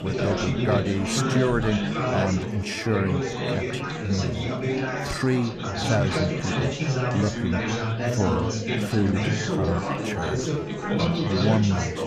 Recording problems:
chatter from many people; very loud; throughout; 1 dB above the speech
uneven, jittery; strongly; from 0.5 to 11 s

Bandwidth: 14.5 kHz